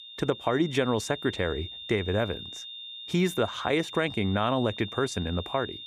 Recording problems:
high-pitched whine; noticeable; throughout; 3.5 kHz, 10 dB below the speech

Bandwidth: 15 kHz